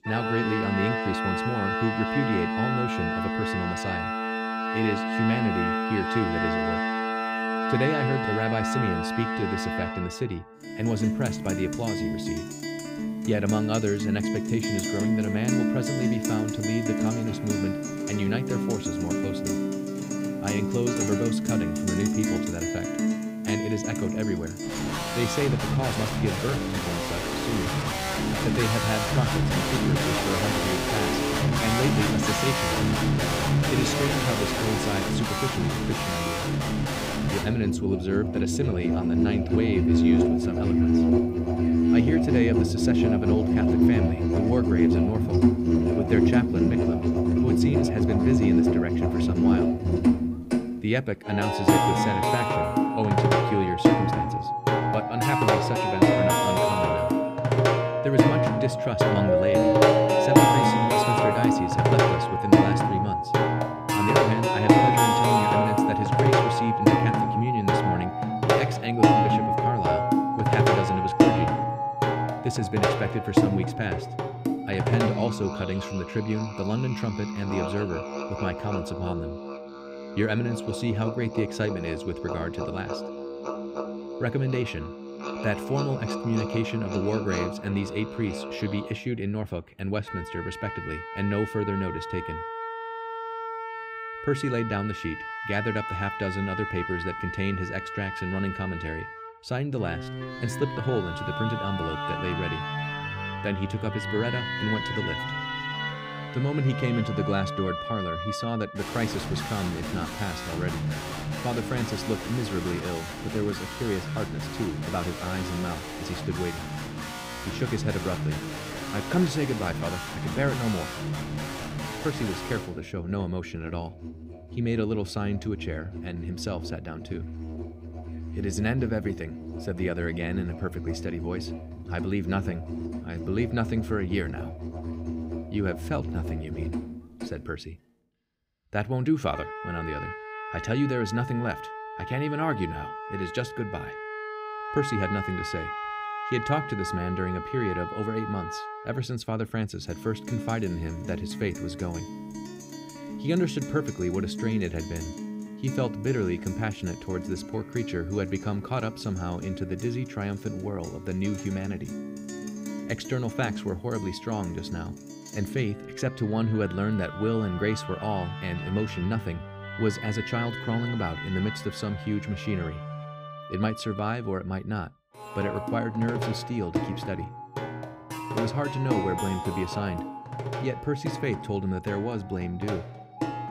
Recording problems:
background music; very loud; throughout; 3 dB above the speech

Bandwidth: 15.5 kHz